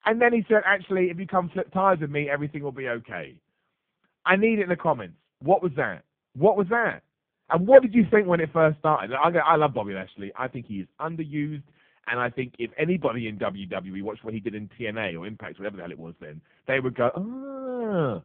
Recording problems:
phone-call audio; poor line

